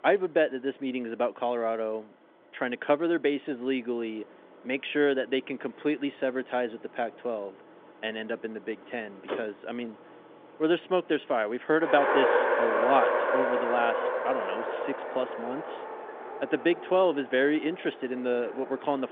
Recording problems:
phone-call audio; nothing above 3.5 kHz
traffic noise; loud; throughout; as loud as the speech

